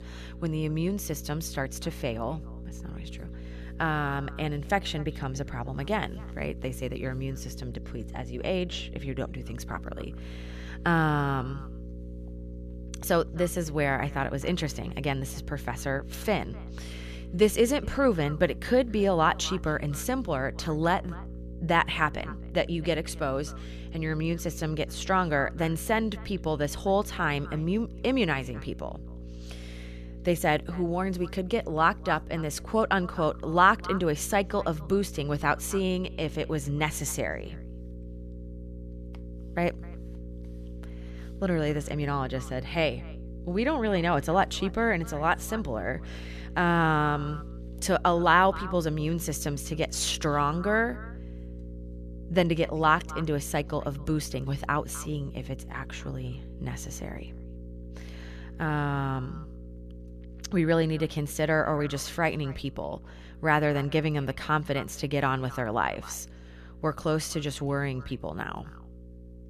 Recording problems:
echo of what is said; faint; throughout; 260 ms later, 20 dB below the speech
electrical hum; faint; throughout; 60 Hz, 25 dB below the speech

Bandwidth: 14 kHz